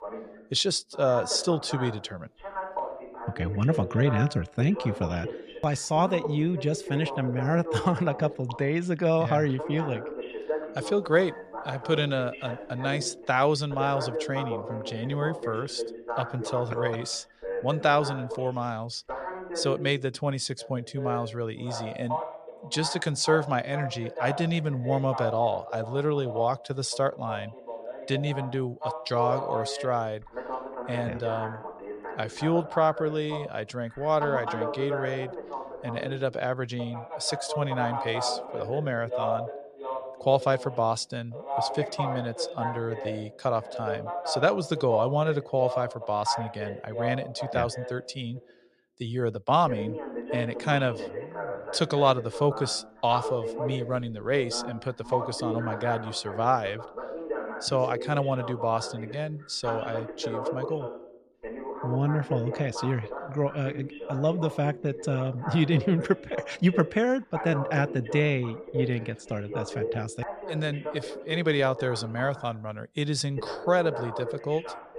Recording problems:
voice in the background; loud; throughout; 7 dB below the speech

